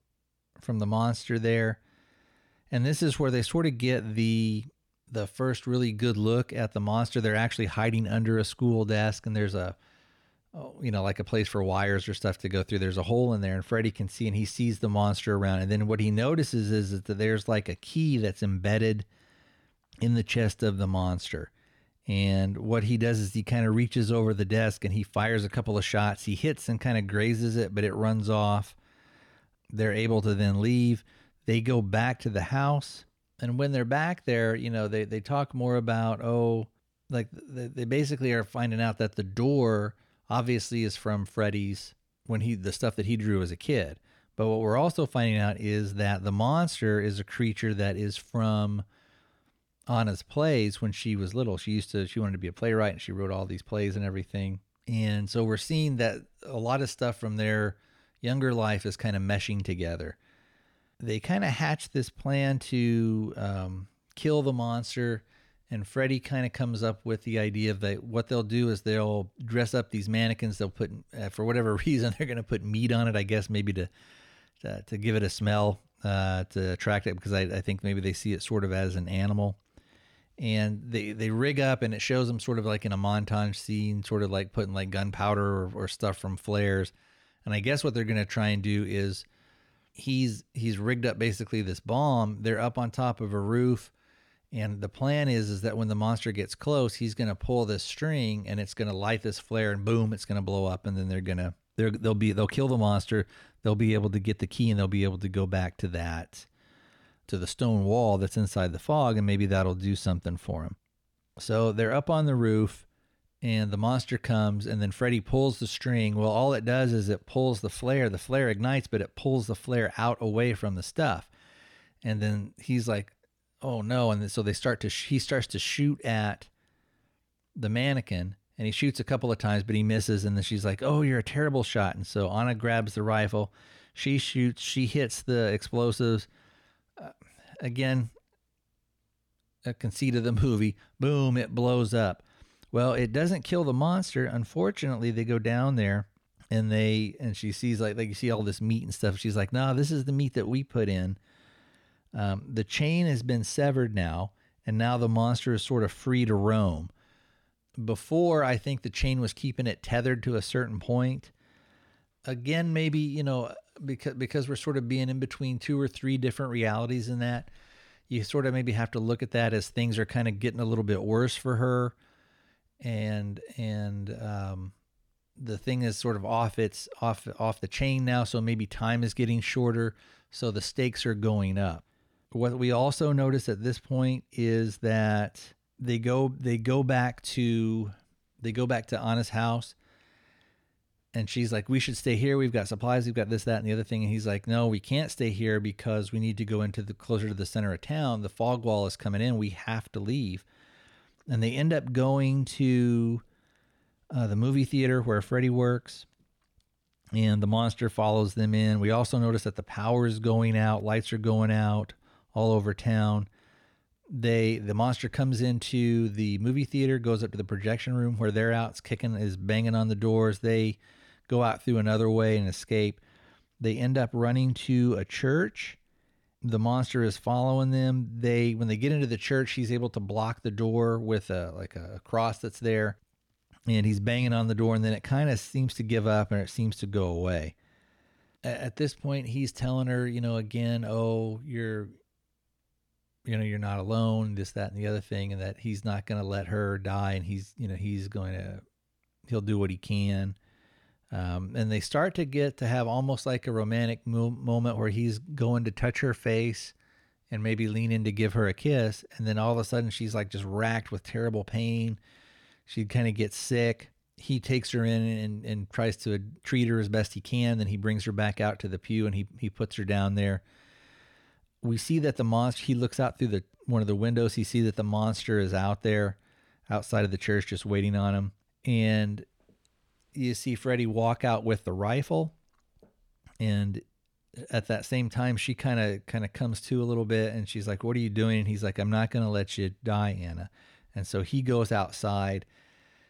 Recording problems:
none

